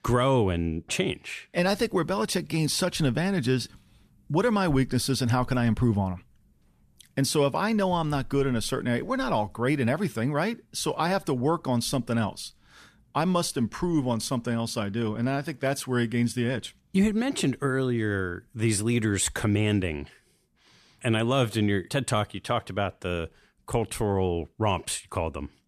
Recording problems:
none

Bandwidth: 14.5 kHz